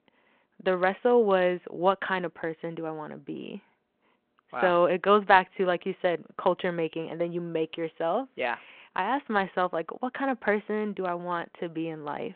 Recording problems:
phone-call audio

